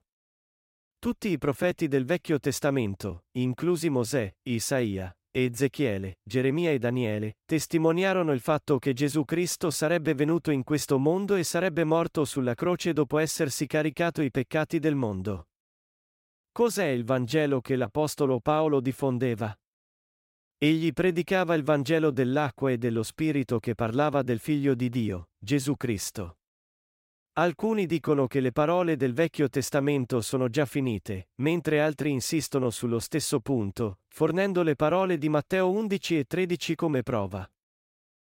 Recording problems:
none

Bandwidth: 16 kHz